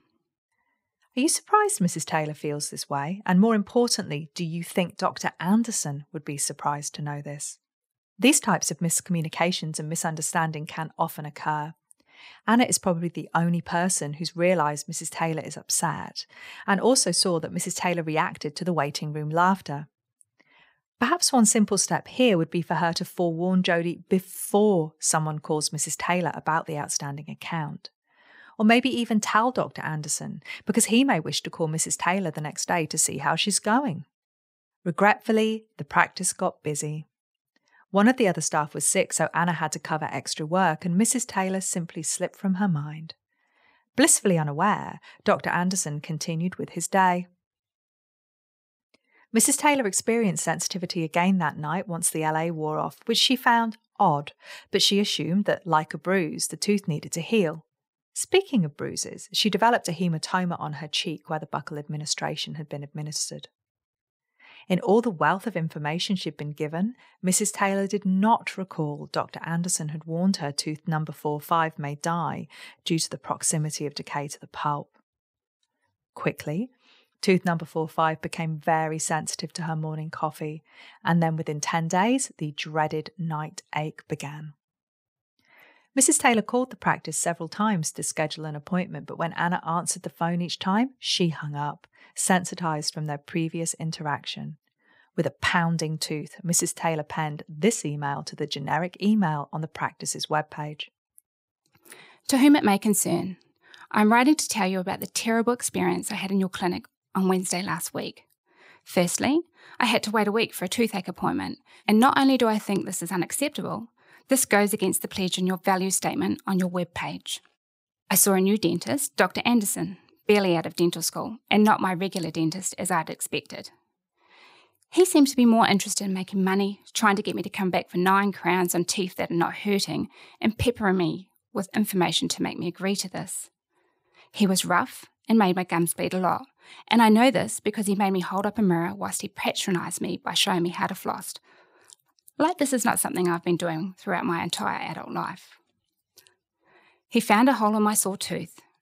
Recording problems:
none

